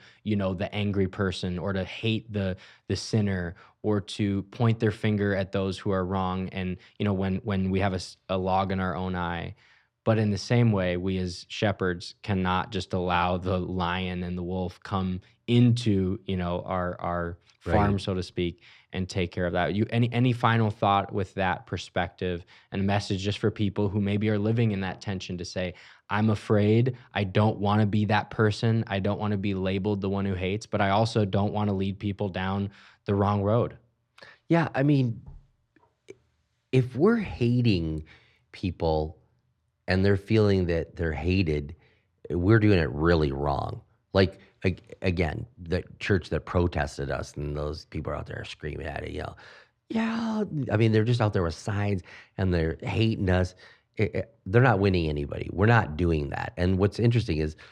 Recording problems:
muffled; very slightly; fading above 3.5 kHz

